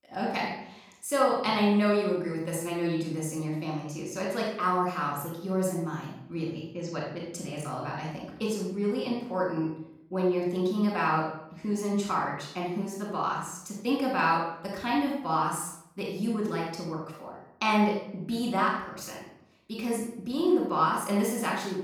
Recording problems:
off-mic speech; far
room echo; noticeable; dies away in 0.7 s

